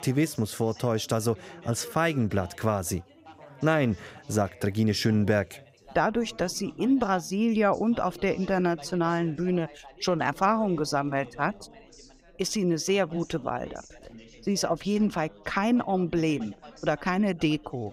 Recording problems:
background chatter; faint; throughout; 3 voices, 20 dB below the speech

